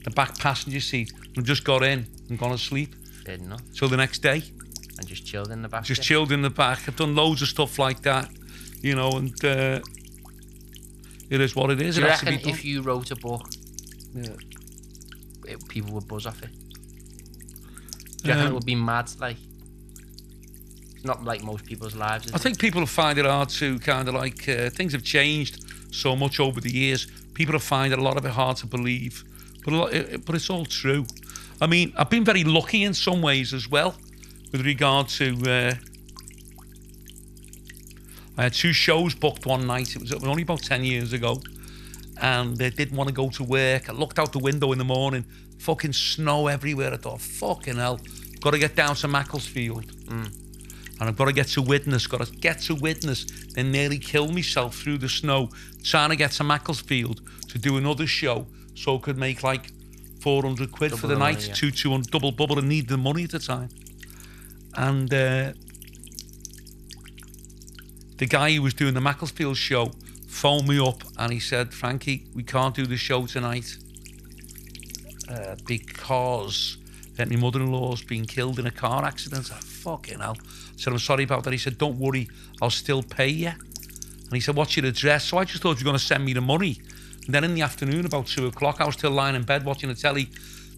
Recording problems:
electrical hum; faint; throughout; 50 Hz, 20 dB below the speech

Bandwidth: 14 kHz